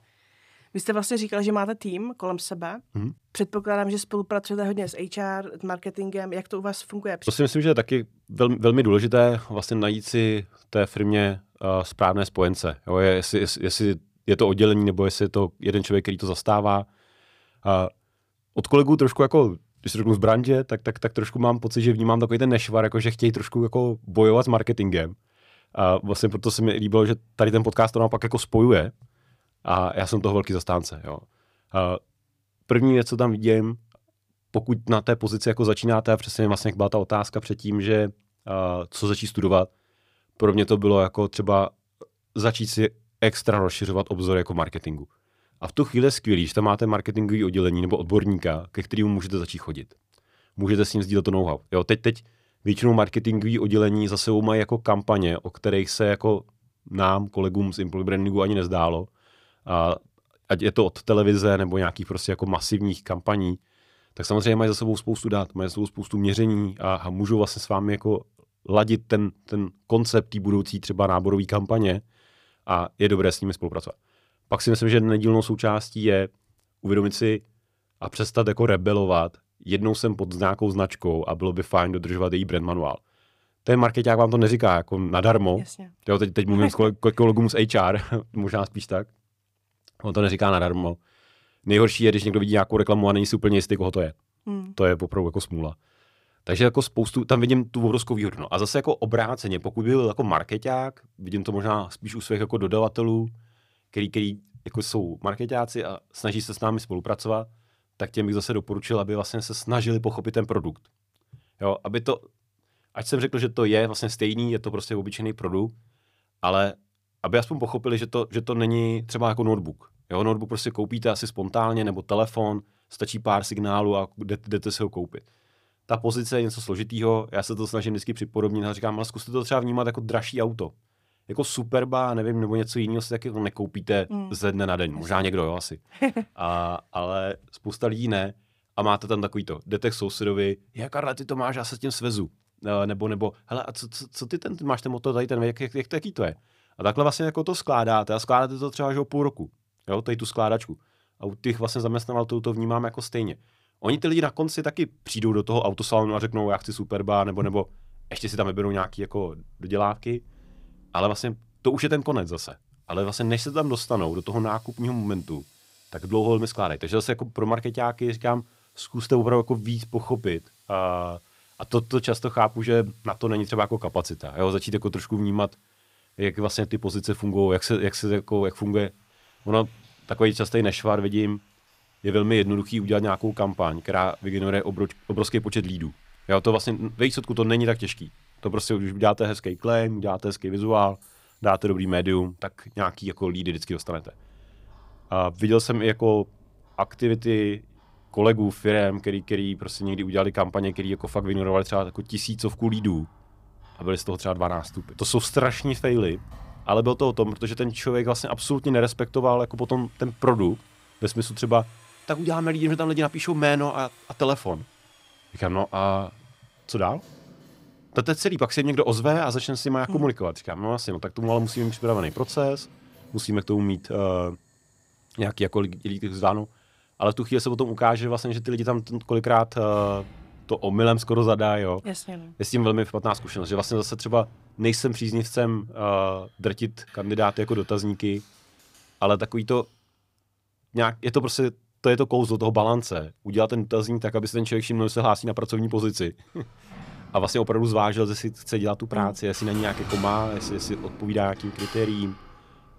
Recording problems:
household noises; faint; from 2:35 on; 25 dB below the speech

